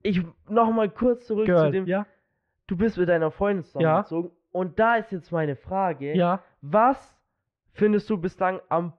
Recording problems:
muffled; very; fading above 2.5 kHz

